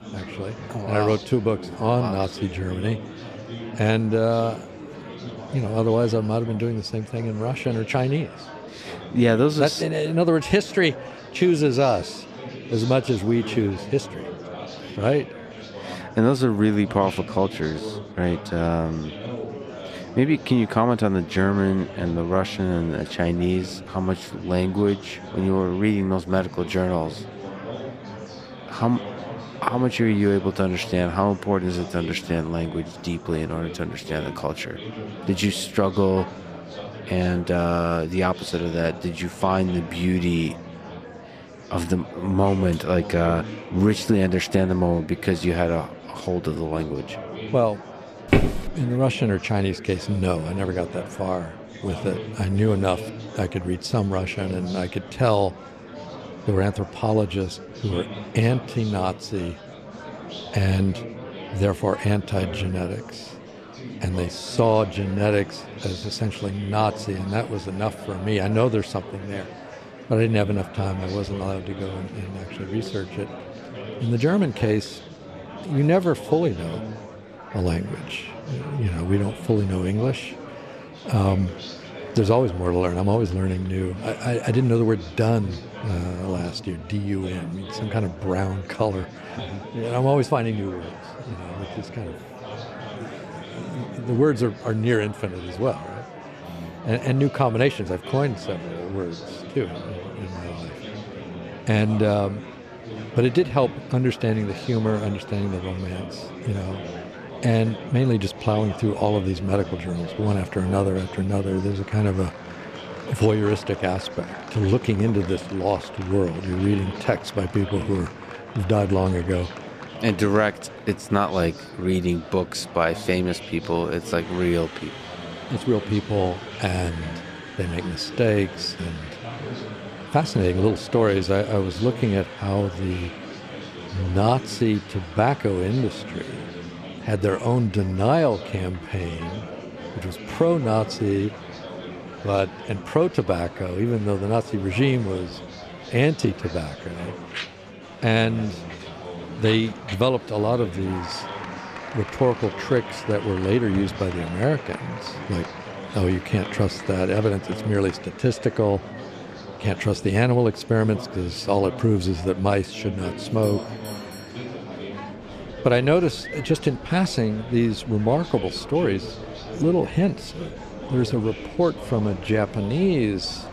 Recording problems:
murmuring crowd; noticeable; throughout; 15 dB below the speech
footsteps; loud; at 48 s; peak 3 dB above the speech
doorbell; faint; from 2:43 to 2:45; peak 15 dB below the speech

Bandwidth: 14.5 kHz